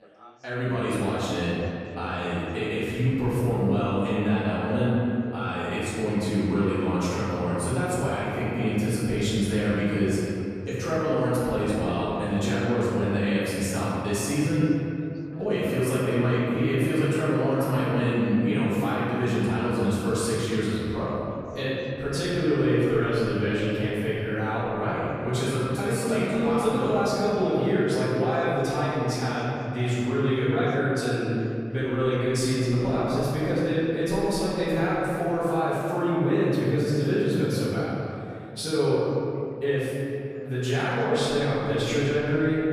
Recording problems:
room echo; strong; dies away in 2.5 s
off-mic speech; far
background chatter; faint; throughout; 4 voices, 25 dB below the speech

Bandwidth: 14.5 kHz